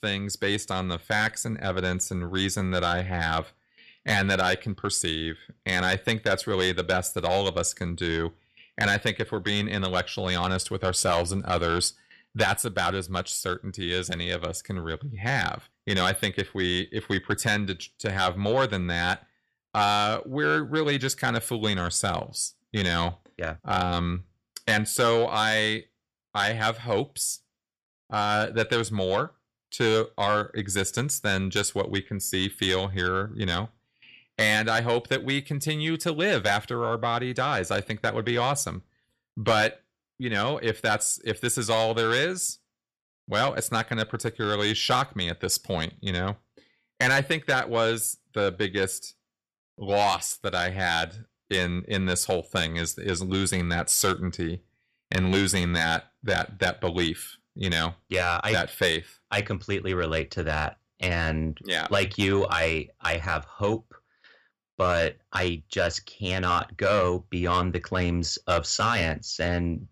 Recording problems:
distortion; slight; 10 dB below the speech

